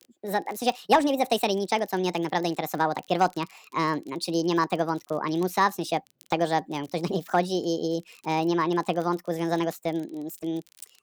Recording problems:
wrong speed and pitch; too fast and too high; 1.5 times normal speed
crackle, like an old record; faint; 30 dB below the speech

